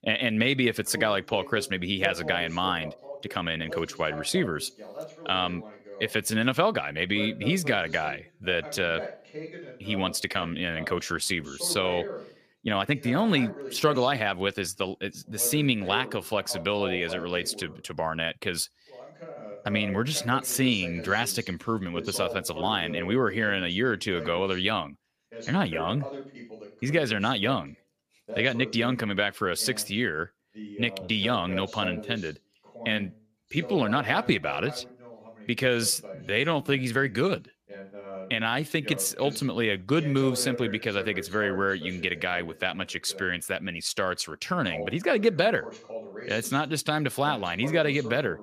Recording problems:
voice in the background; noticeable; throughout; 15 dB below the speech
uneven, jittery; strongly; from 3 to 39 s

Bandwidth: 15 kHz